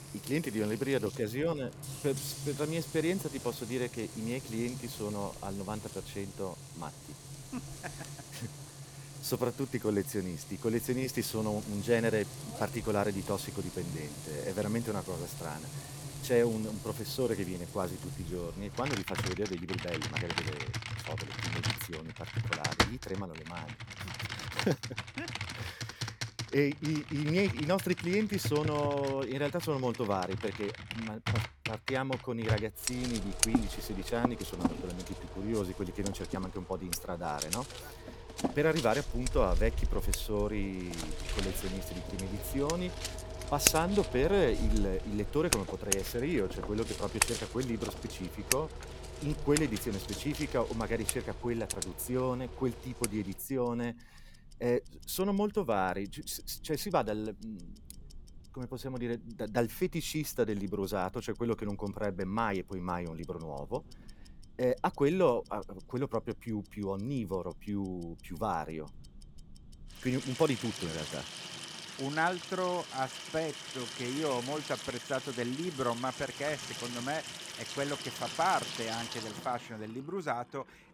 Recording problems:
household noises; loud; throughout; 4 dB below the speech

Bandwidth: 17.5 kHz